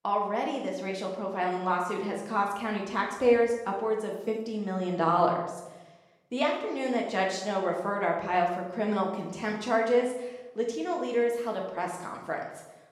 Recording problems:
off-mic speech; far
room echo; noticeable; dies away in 0.8 s

